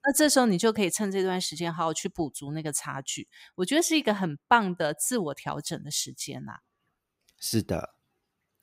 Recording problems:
none

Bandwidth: 15.5 kHz